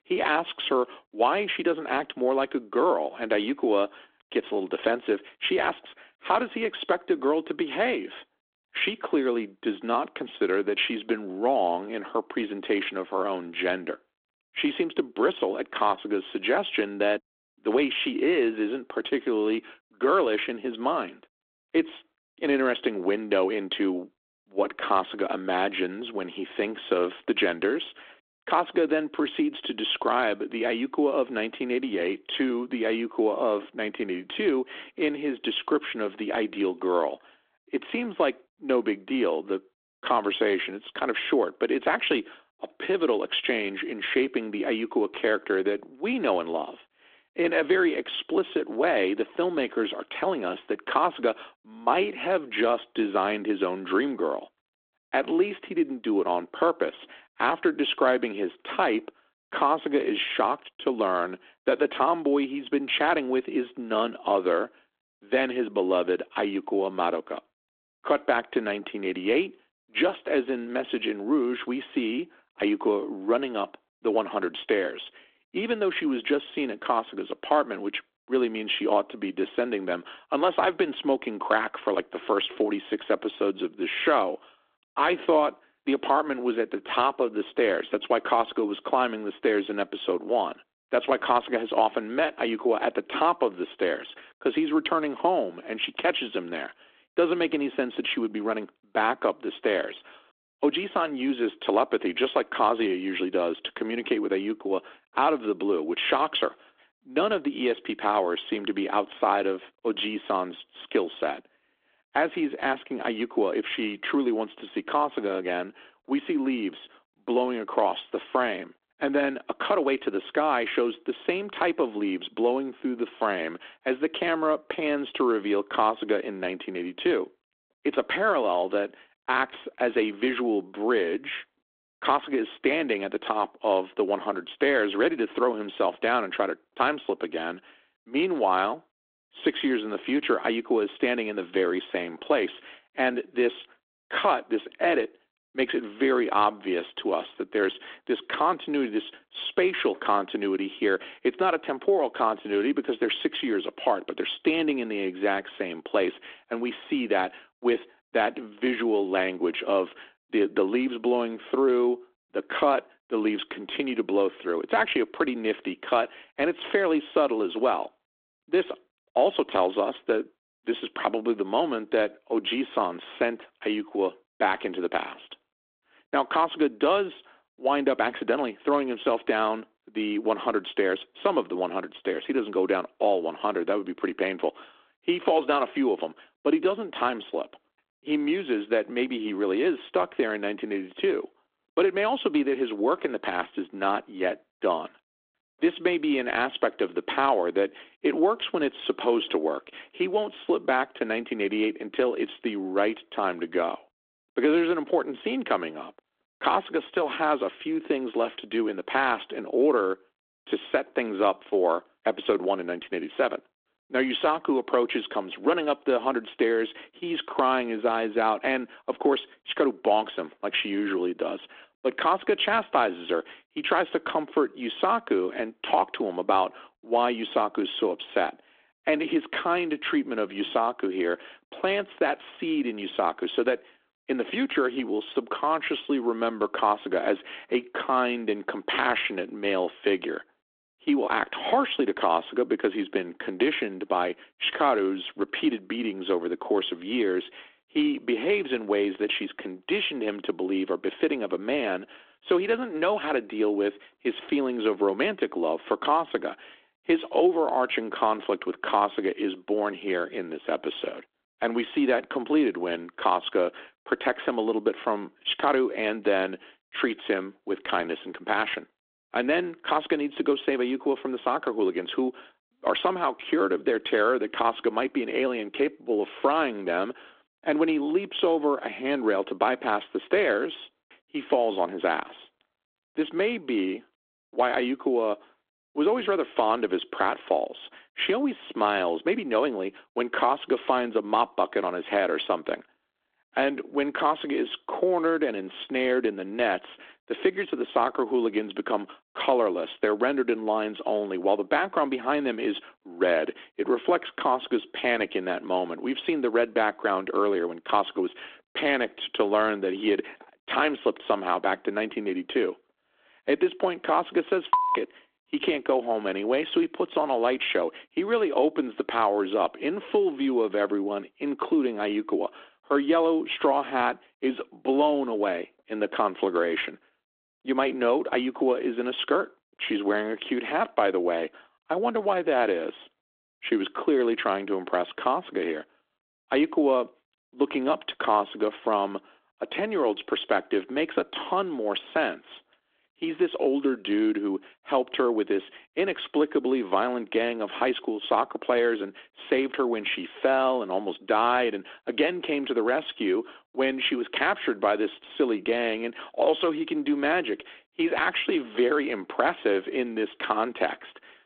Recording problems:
phone-call audio; nothing above 3.5 kHz

